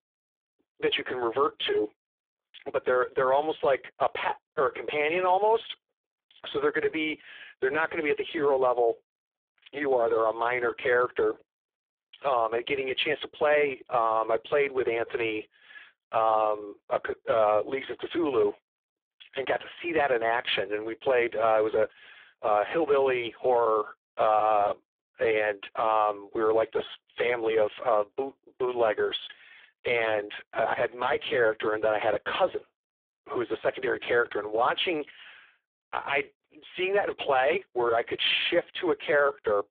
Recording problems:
phone-call audio; poor line; nothing above 3.5 kHz
thin; very; fading below 300 Hz

